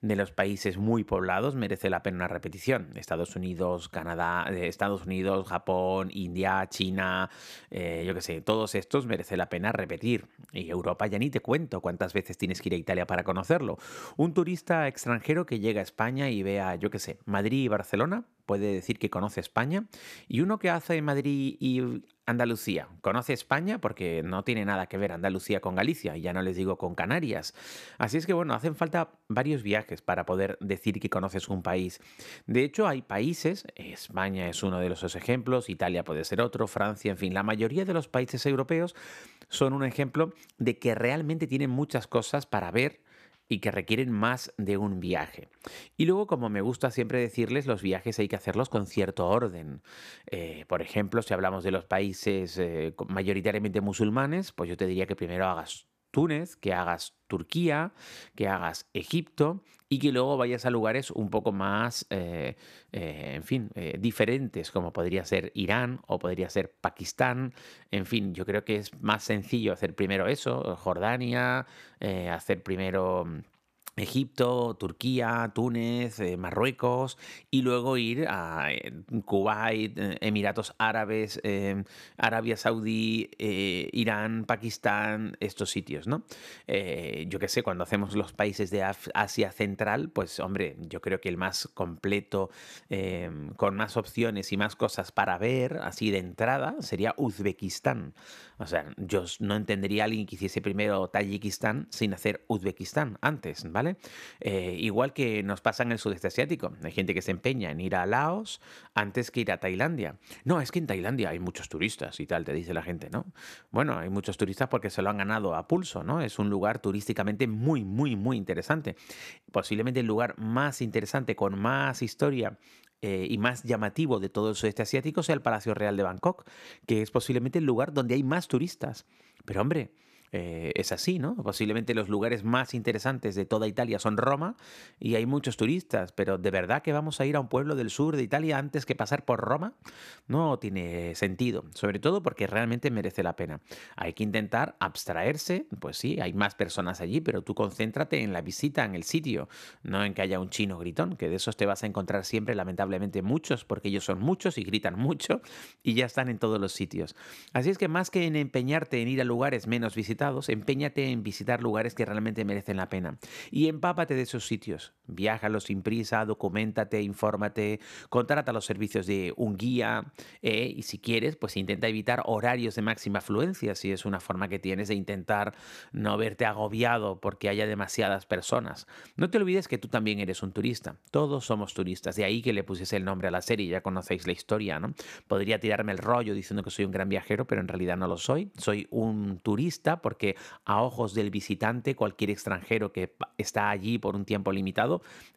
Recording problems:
none

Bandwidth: 14.5 kHz